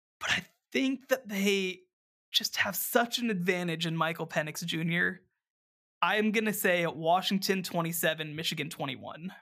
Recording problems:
none

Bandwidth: 15 kHz